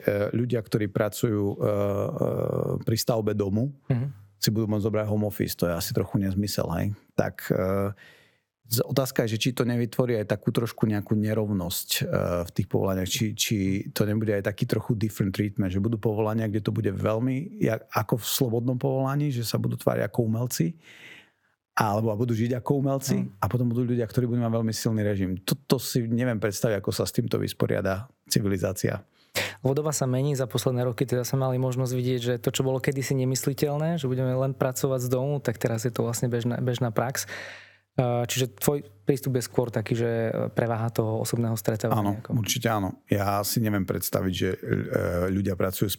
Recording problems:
squashed, flat; somewhat

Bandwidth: 17.5 kHz